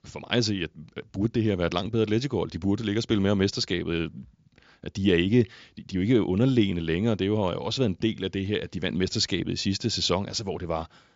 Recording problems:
high frequencies cut off; noticeable; nothing above 7.5 kHz

